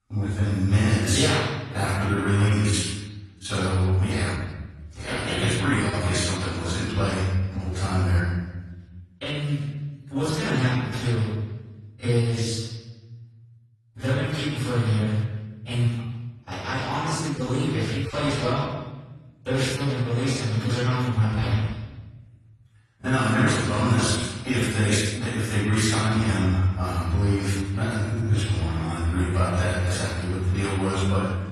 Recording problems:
room echo; strong; dies away in 1.2 s
off-mic speech; far
garbled, watery; slightly

